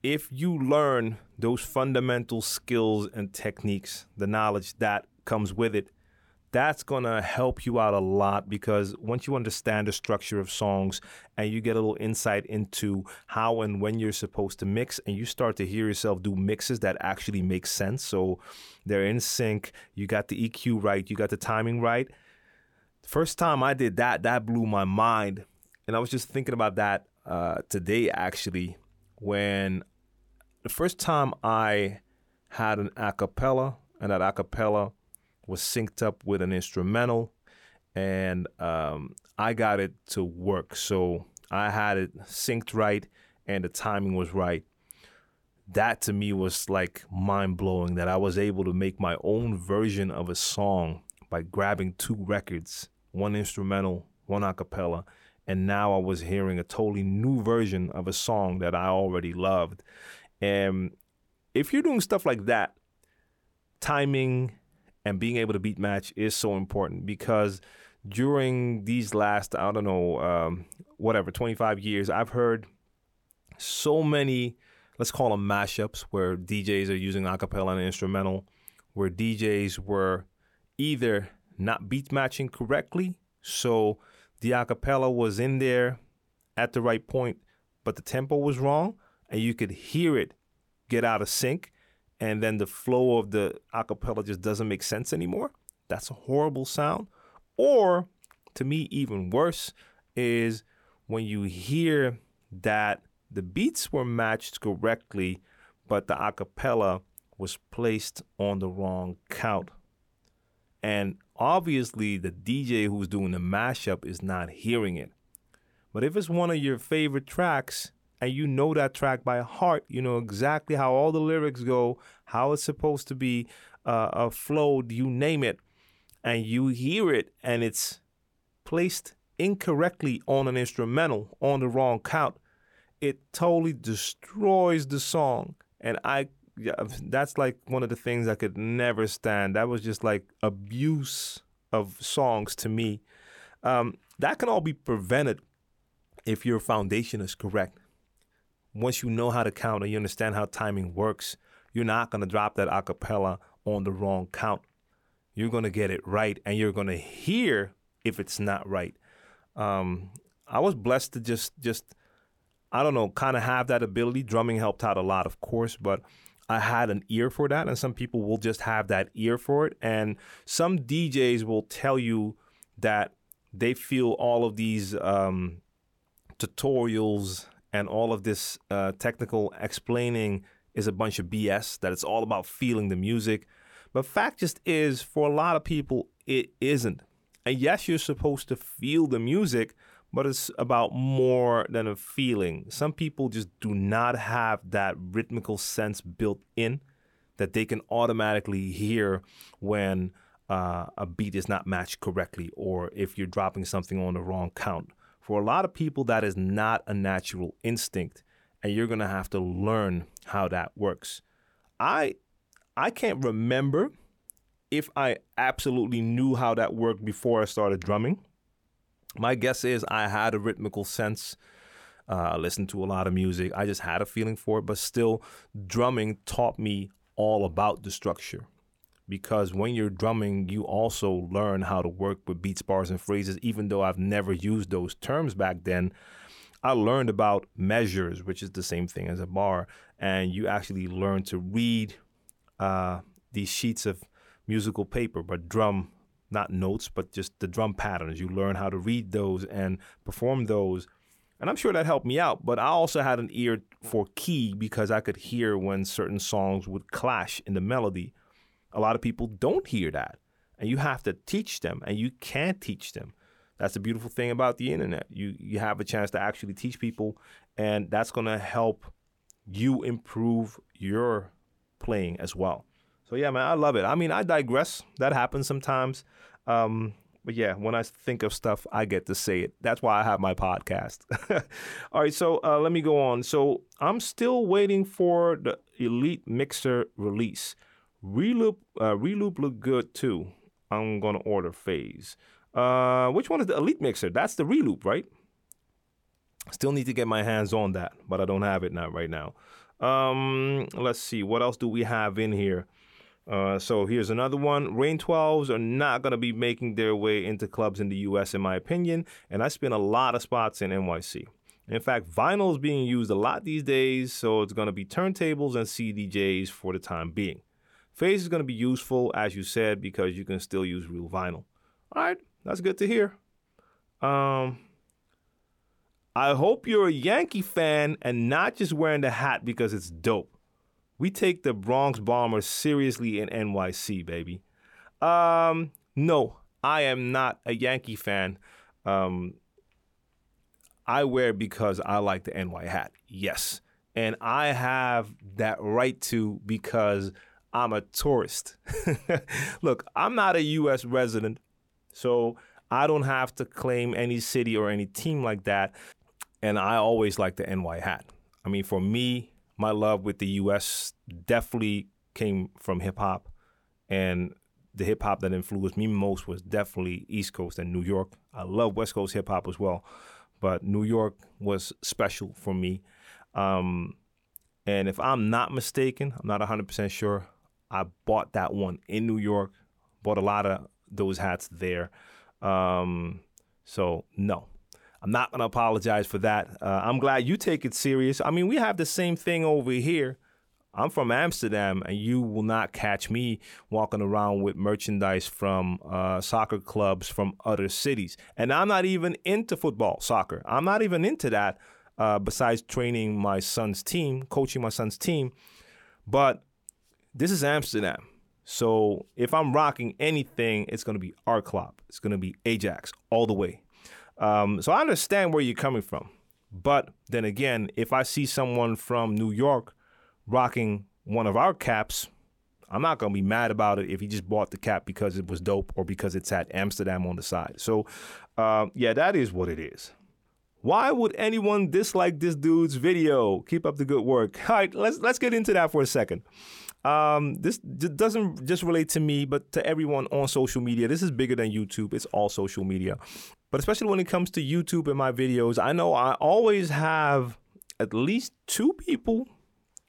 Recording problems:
none

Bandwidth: 18.5 kHz